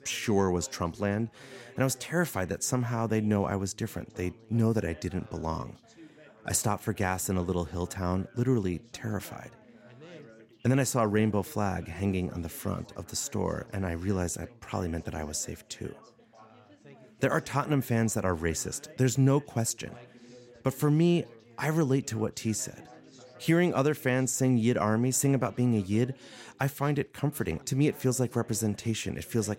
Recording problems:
background chatter; faint; throughout; 4 voices, 25 dB below the speech

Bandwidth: 16 kHz